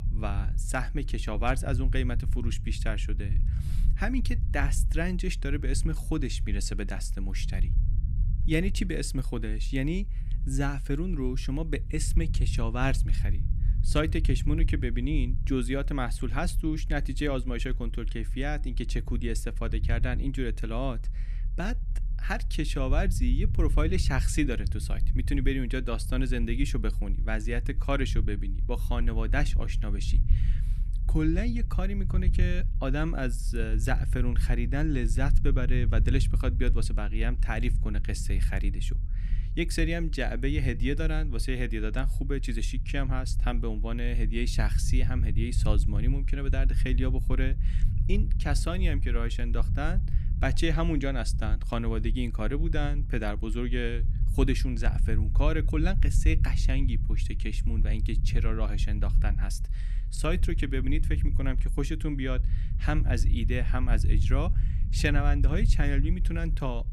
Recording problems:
low rumble; noticeable; throughout; 15 dB below the speech

